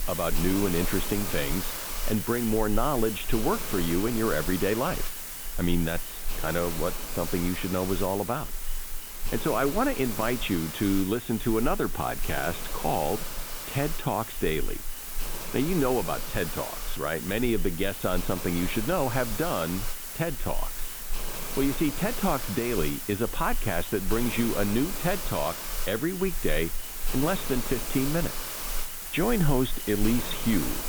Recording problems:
high frequencies cut off; severe; nothing above 4 kHz
hiss; loud; throughout; 5 dB below the speech

